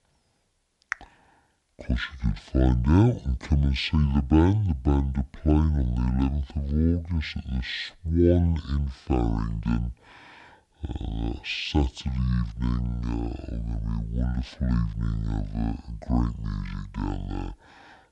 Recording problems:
wrong speed and pitch; too slow and too low; 0.6 times normal speed

